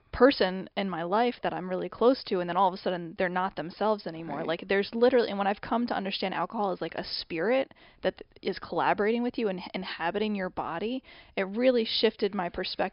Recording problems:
high frequencies cut off; noticeable; nothing above 5.5 kHz

